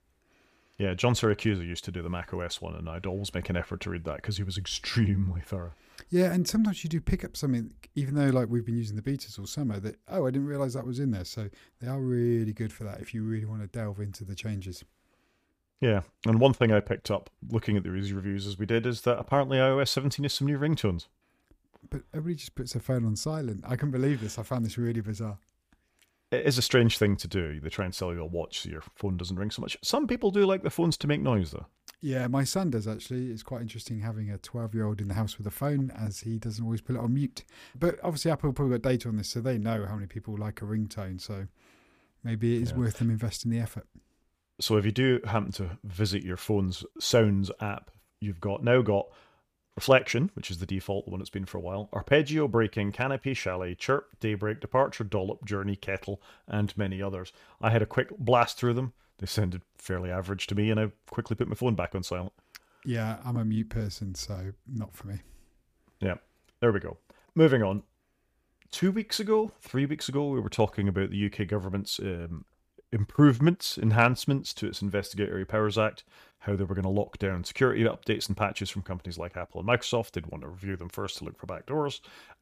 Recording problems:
none

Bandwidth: 15 kHz